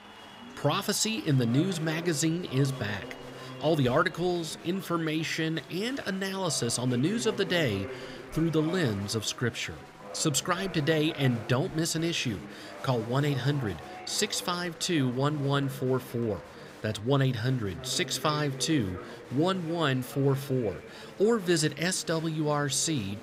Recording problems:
chatter from many people; noticeable; throughout; 15 dB below the speech

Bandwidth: 15.5 kHz